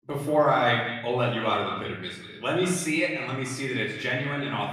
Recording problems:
echo of what is said; strong; throughout; 180 ms later, 10 dB below the speech
off-mic speech; far
room echo; noticeable; dies away in 0.7 s

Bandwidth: 15 kHz